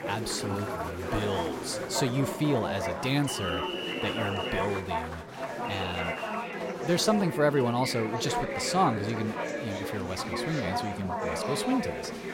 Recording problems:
chatter from many people; loud; throughout; 2 dB below the speech

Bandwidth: 16.5 kHz